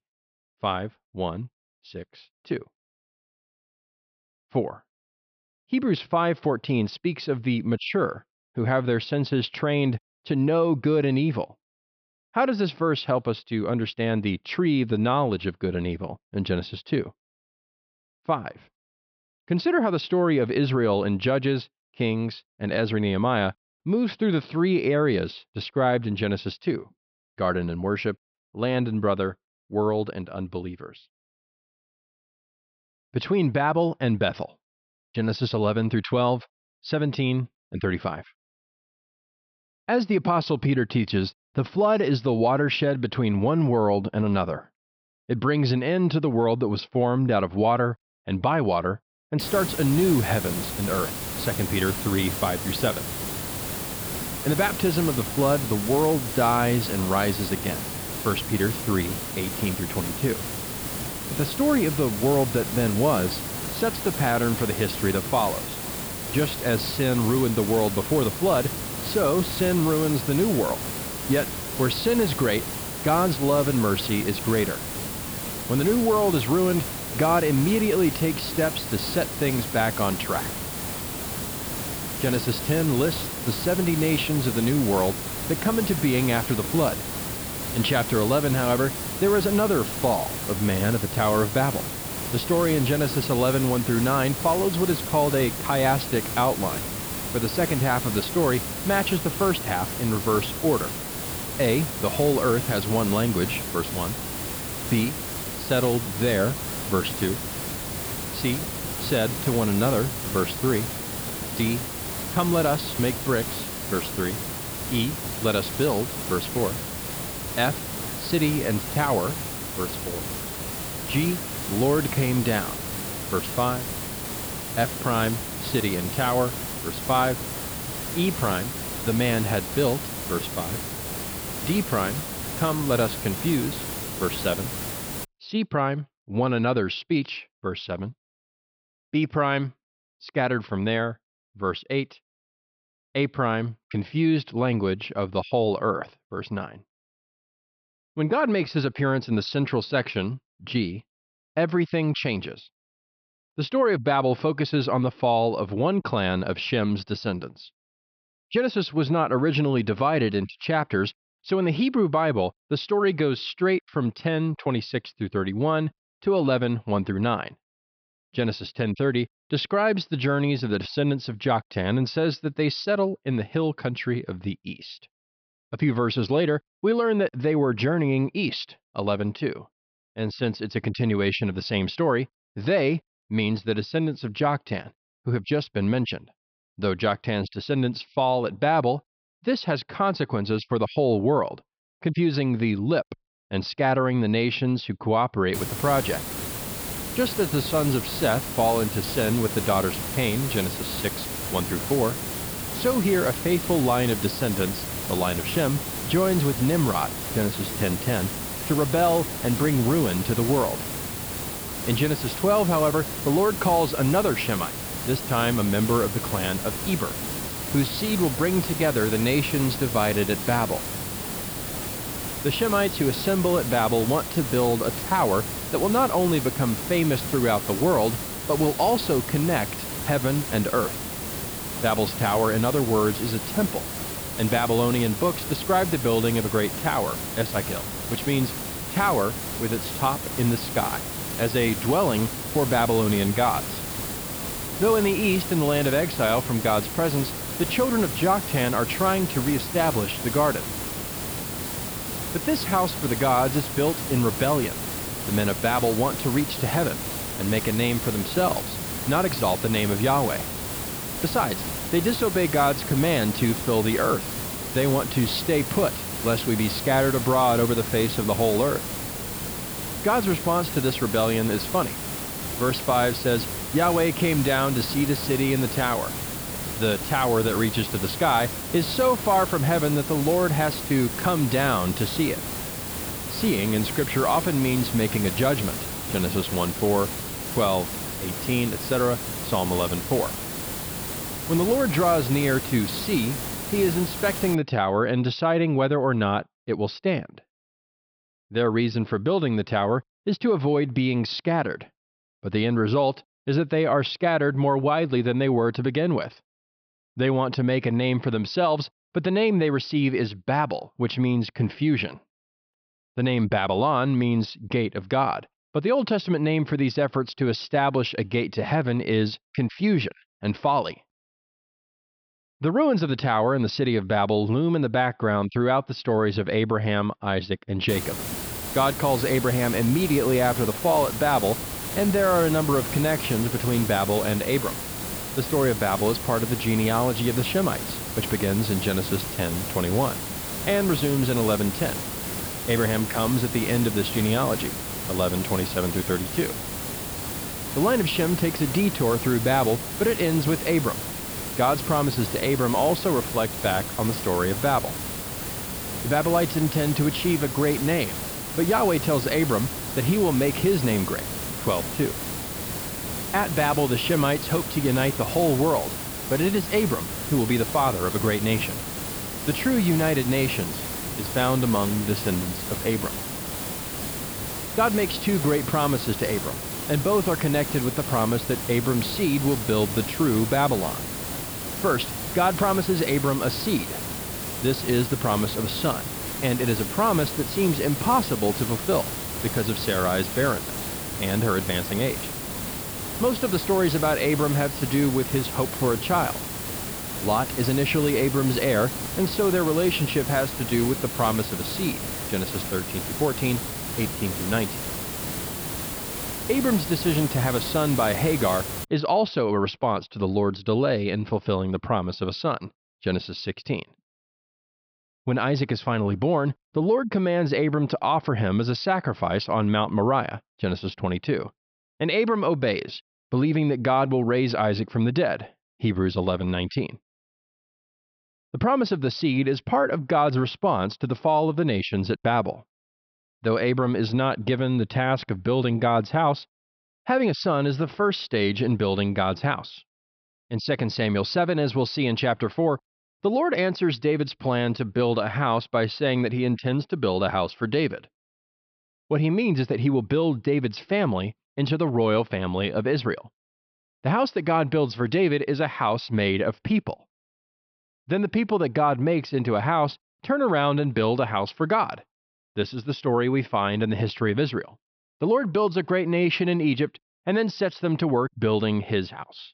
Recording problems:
high frequencies cut off; noticeable; nothing above 5.5 kHz
hiss; loud; from 49 s to 2:15, from 3:16 to 4:55 and from 5:28 to 6:49; 5 dB below the speech

